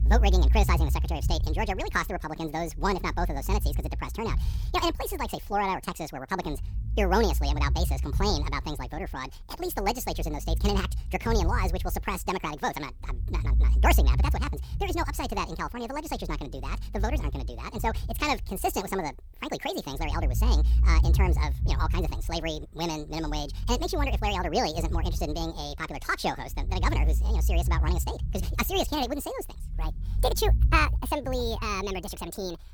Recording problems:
wrong speed and pitch; too fast and too high; 1.7 times normal speed
low rumble; noticeable; throughout; 20 dB below the speech

